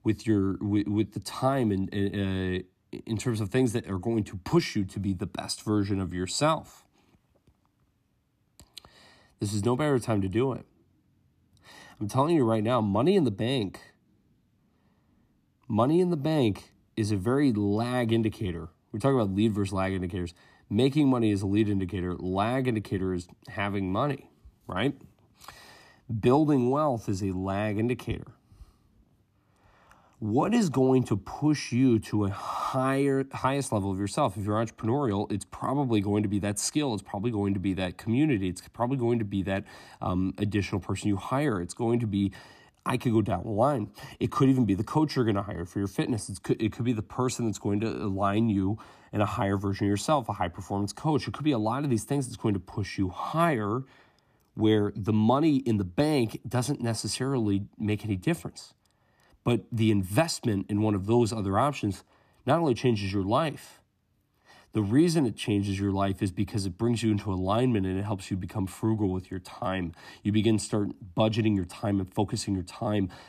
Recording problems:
none

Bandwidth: 14.5 kHz